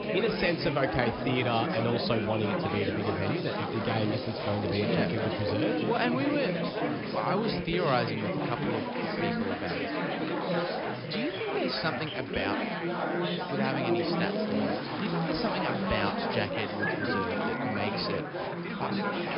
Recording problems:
high frequencies cut off; noticeable; nothing above 5.5 kHz
chatter from many people; very loud; throughout; 1 dB above the speech
animal sounds; noticeable; throughout; 10 dB below the speech
crackling; noticeable; from 3.5 to 5.5 s, from 14 to 16 s and at 17 s; 15 dB below the speech

